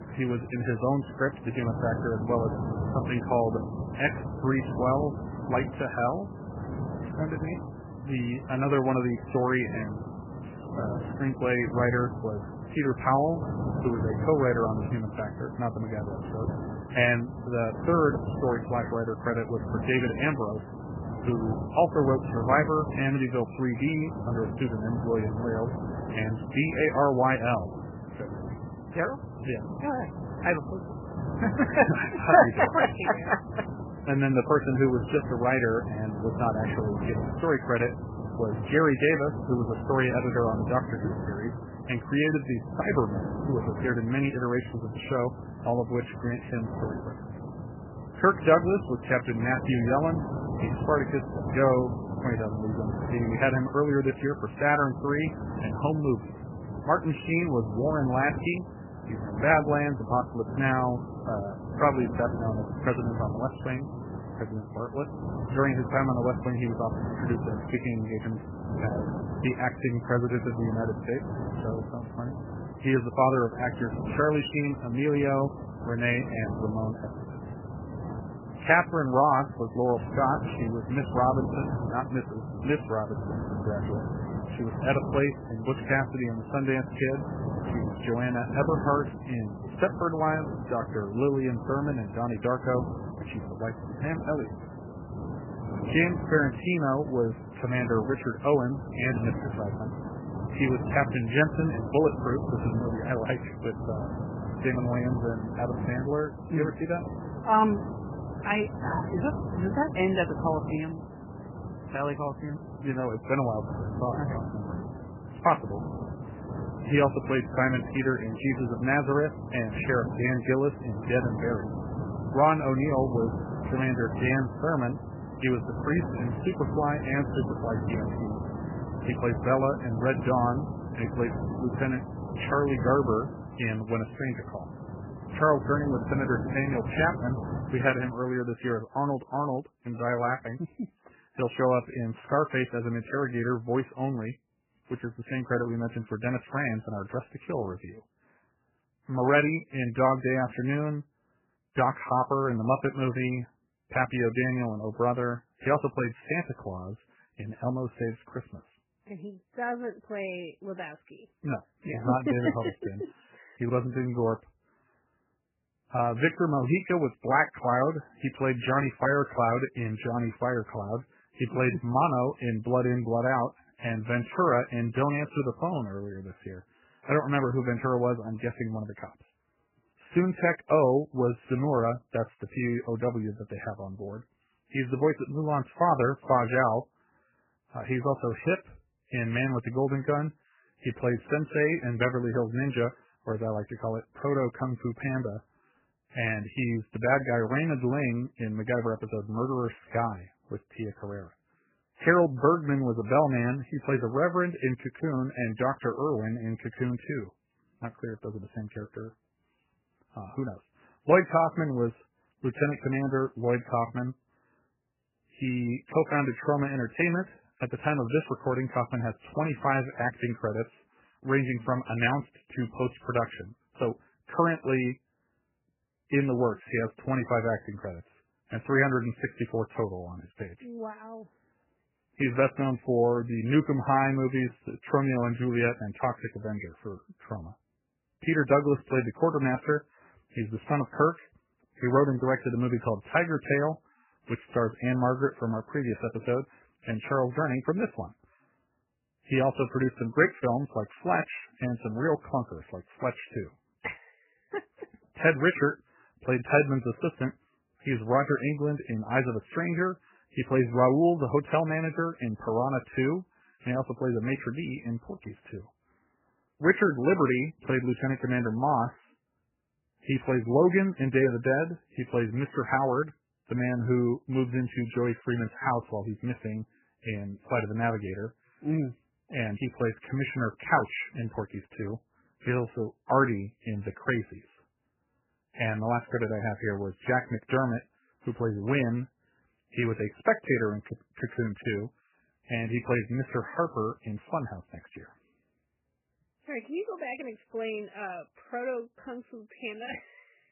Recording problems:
garbled, watery; badly; nothing above 3 kHz
wind noise on the microphone; occasional gusts; until 2:18; 10 dB below the speech

